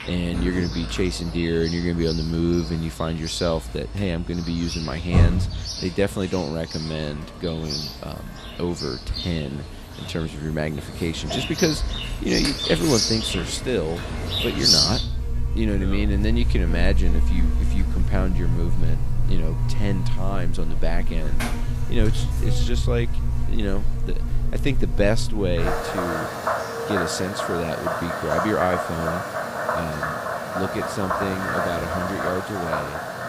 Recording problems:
animal sounds; very loud; throughout; 1 dB above the speech

